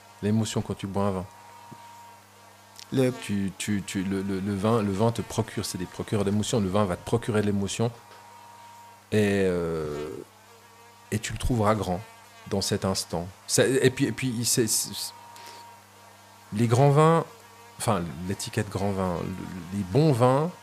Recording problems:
electrical hum; noticeable; throughout; 50 Hz, 20 dB below the speech

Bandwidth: 15 kHz